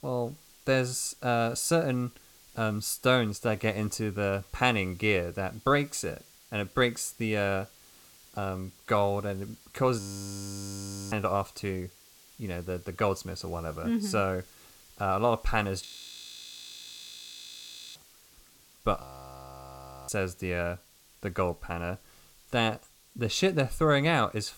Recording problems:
hiss; faint; throughout; 25 dB below the speech
audio freezing; at 10 s for 1 s, at 16 s for 2 s and at 19 s for 1 s

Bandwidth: 17 kHz